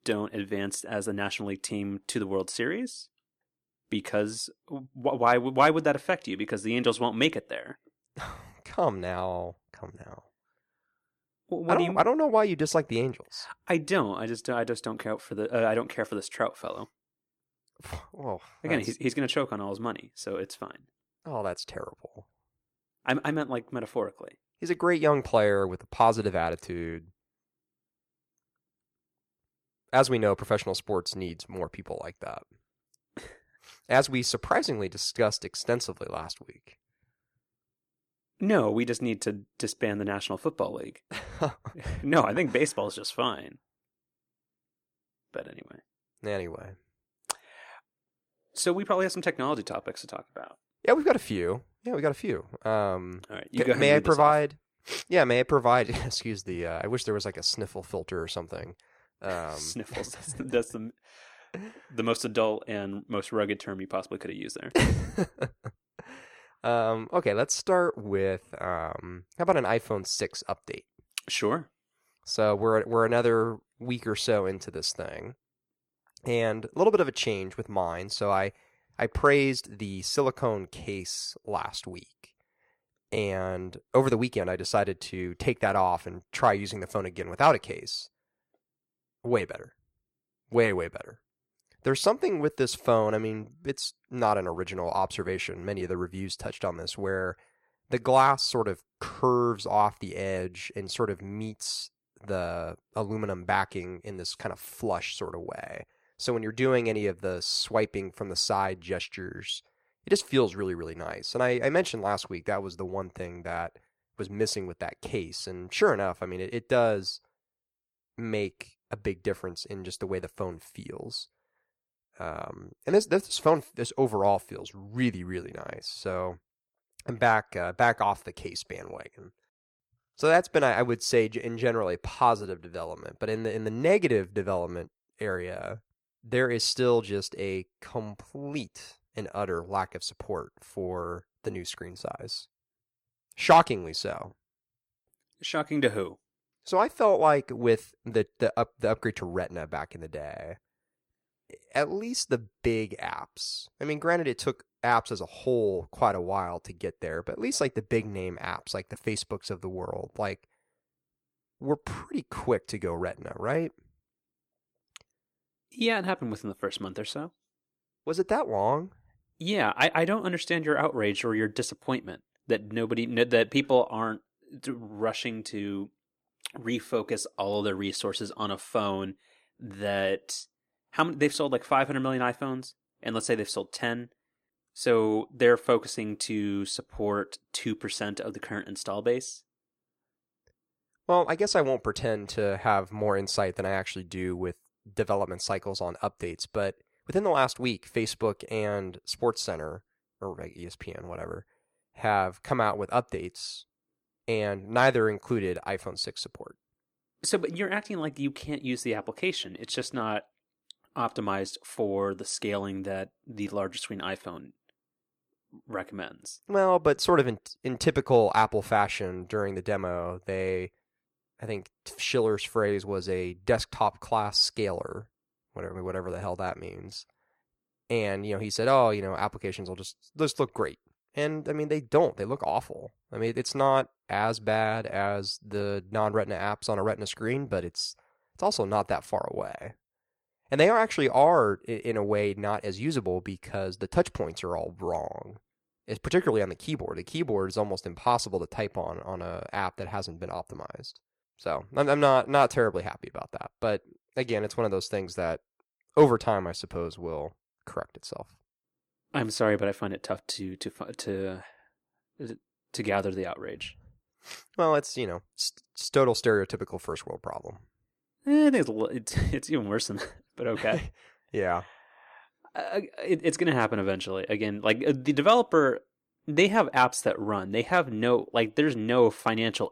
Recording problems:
none

